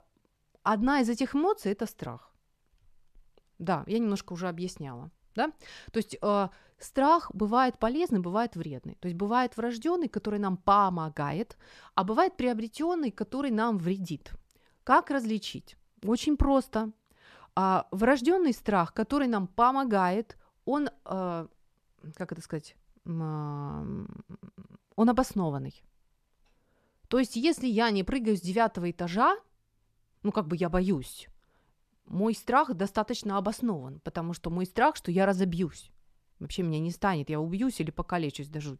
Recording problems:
none

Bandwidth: 14.5 kHz